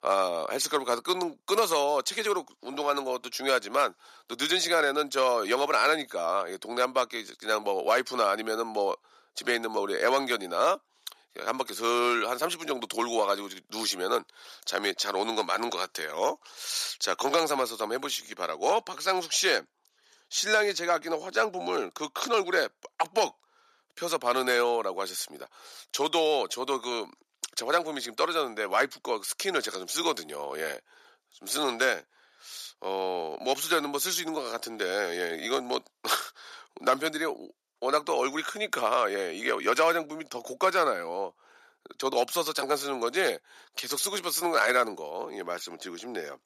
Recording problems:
thin; very; fading below 400 Hz

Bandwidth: 14.5 kHz